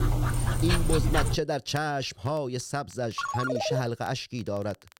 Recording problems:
crackle, like an old record; faint; 25 dB below the speech
dog barking; loud; until 1.5 s; peak 4 dB above the speech
phone ringing; loud; at 3 s; peak 1 dB above the speech

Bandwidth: 16 kHz